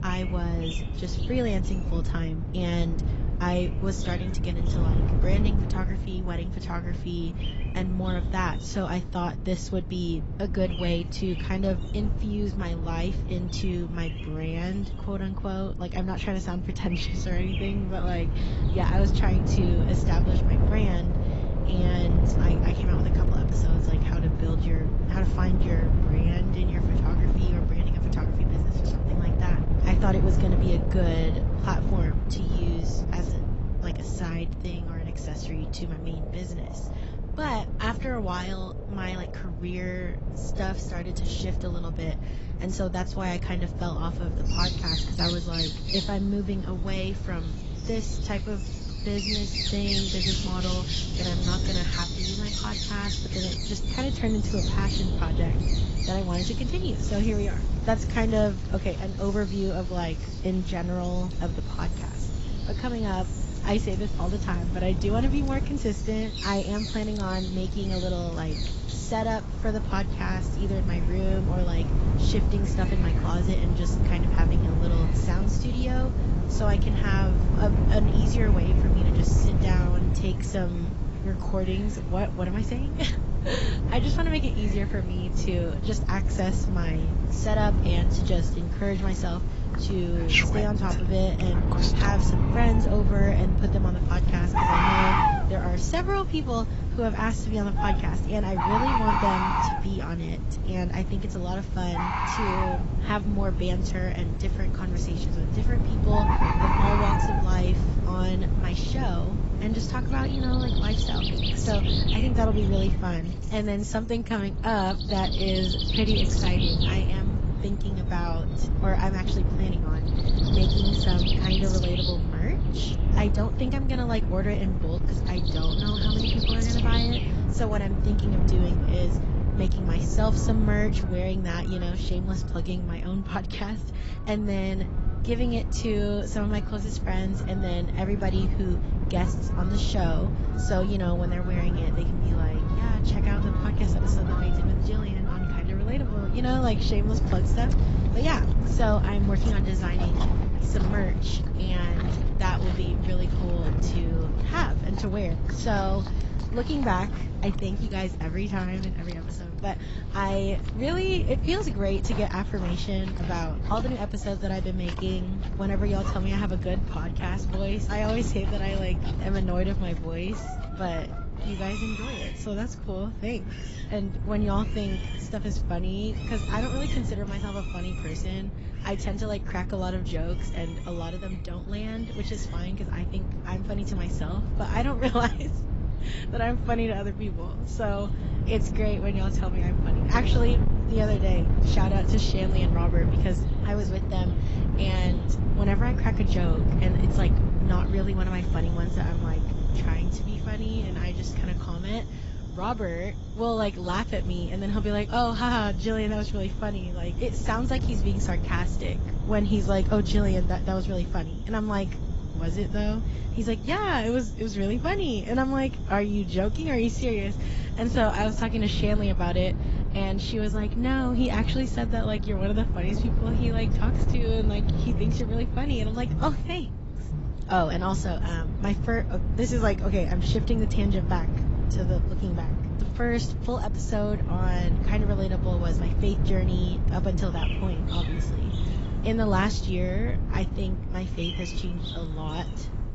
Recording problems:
garbled, watery; badly; nothing above 7.5 kHz
wind noise on the microphone; heavy; 7 dB below the speech
animal sounds; loud; throughout; 4 dB below the speech

